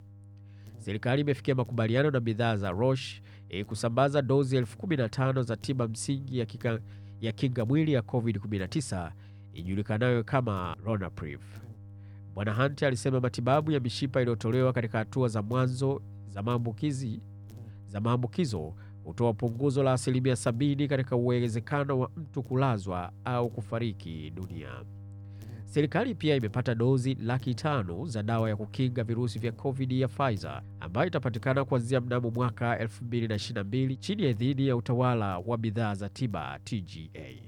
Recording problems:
electrical hum; faint; throughout; 50 Hz, 25 dB below the speech

